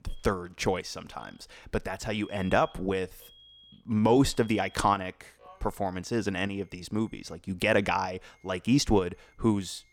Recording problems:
alarms or sirens; faint; throughout; 25 dB below the speech

